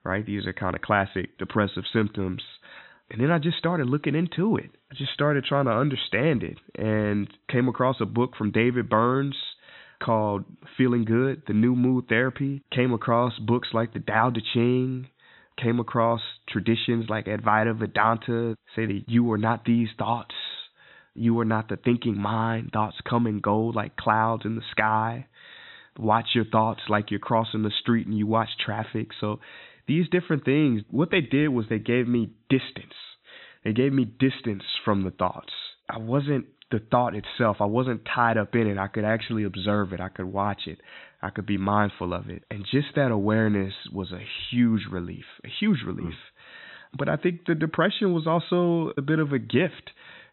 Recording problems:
high frequencies cut off; severe; nothing above 4 kHz

